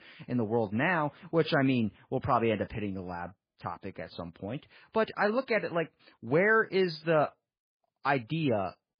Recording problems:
garbled, watery; badly

